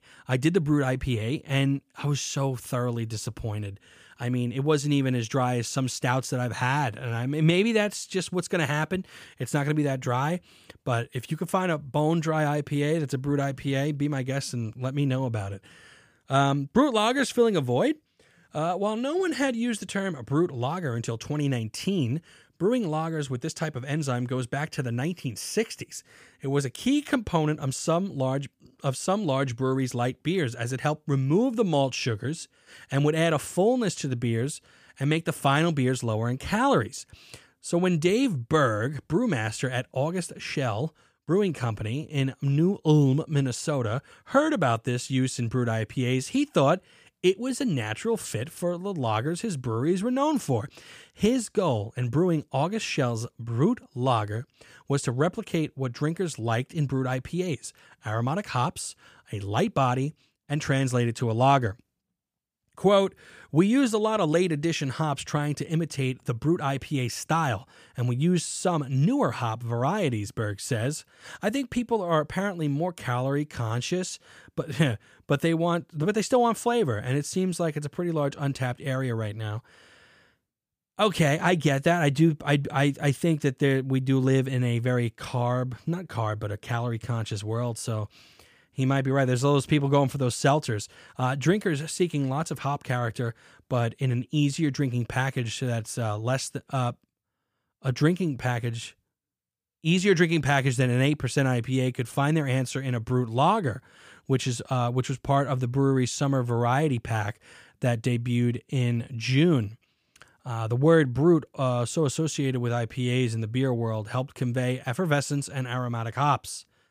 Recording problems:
none

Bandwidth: 15 kHz